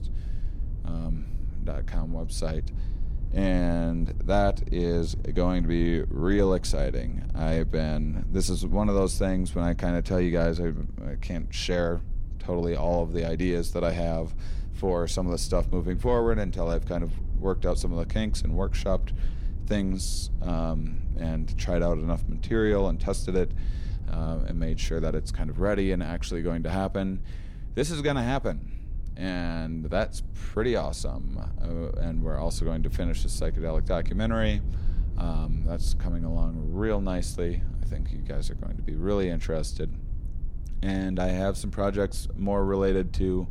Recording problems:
low rumble; faint; throughout; 20 dB below the speech

